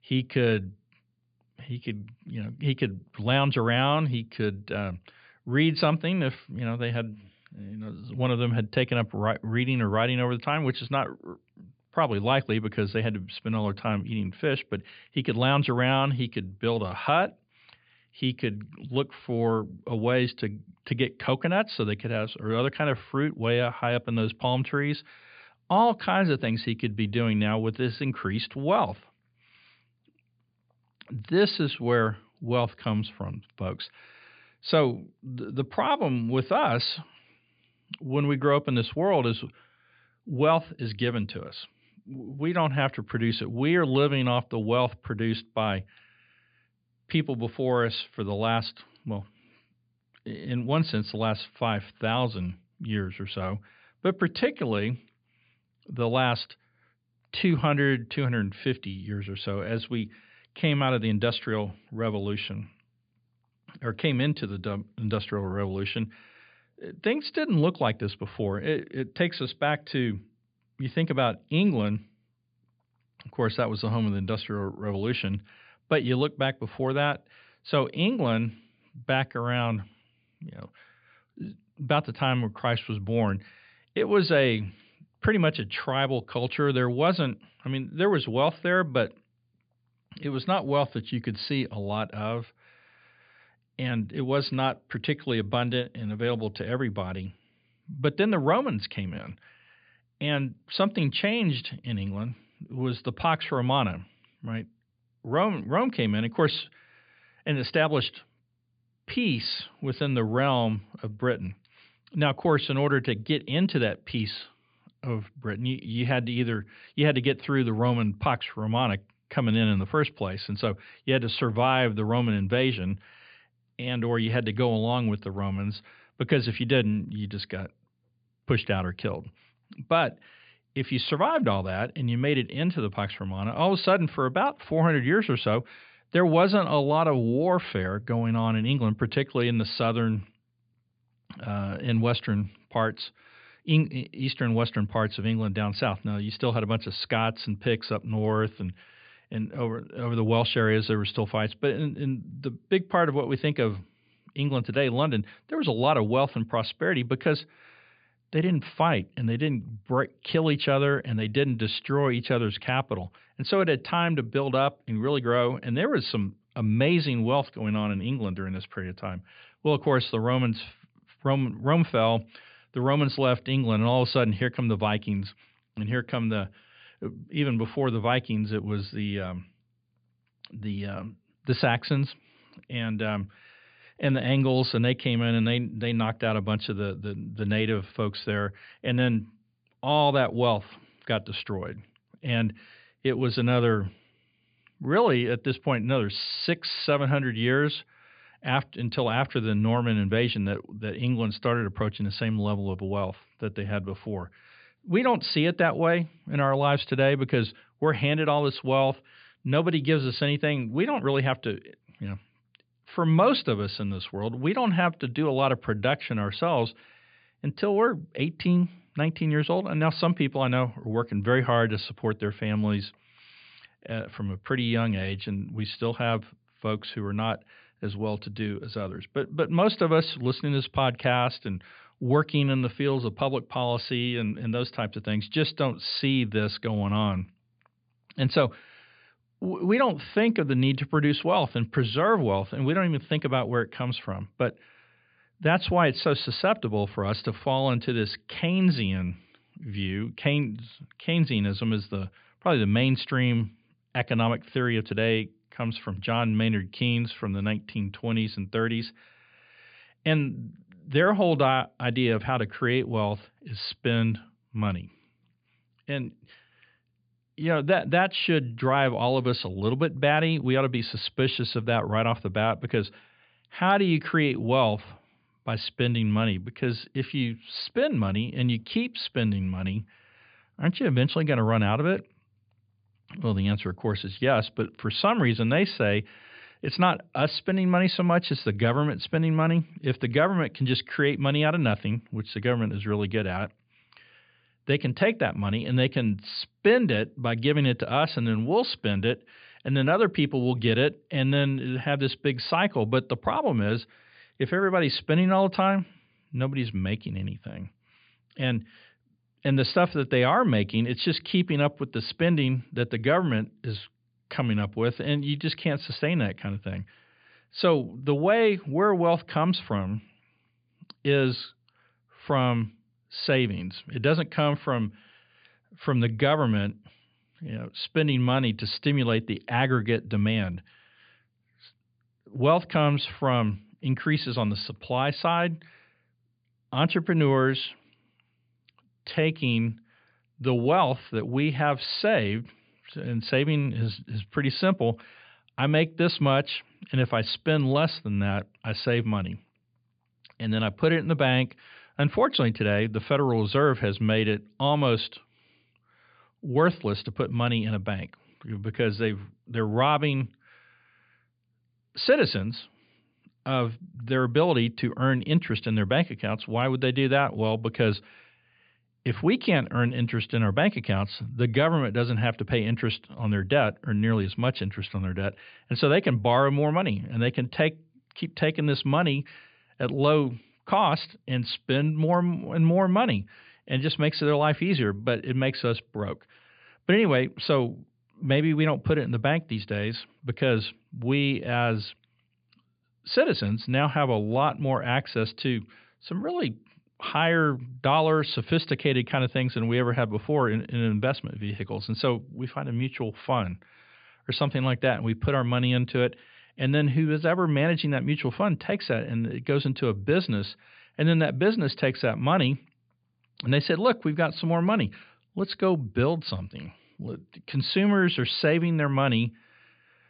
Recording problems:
high frequencies cut off; severe; nothing above 5 kHz

